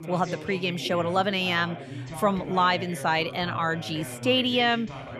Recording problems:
background chatter; noticeable; throughout; 2 voices, 10 dB below the speech

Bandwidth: 13.5 kHz